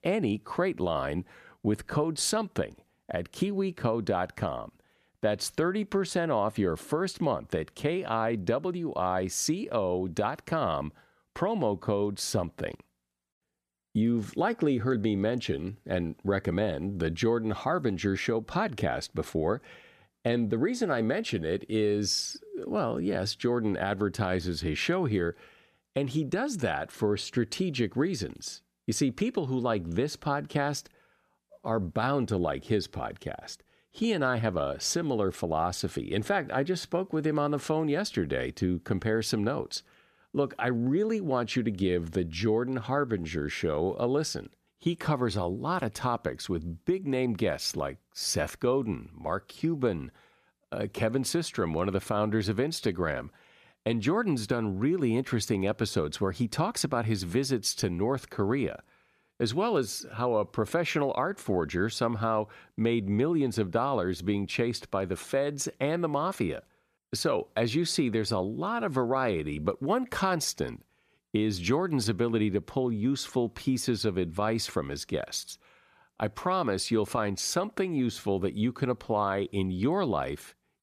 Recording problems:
none

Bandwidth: 14.5 kHz